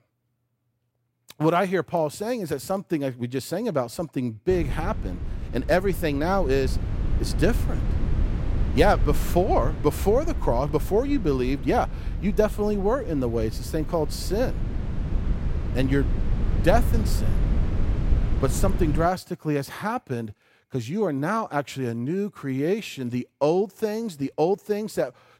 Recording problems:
wind noise on the microphone; occasional gusts; from 4.5 to 19 s; 15 dB below the speech

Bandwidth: 16 kHz